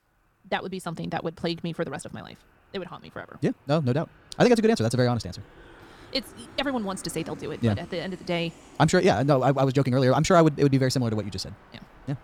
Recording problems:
wrong speed, natural pitch; too fast; 1.6 times normal speed
train or aircraft noise; faint; throughout; 25 dB below the speech

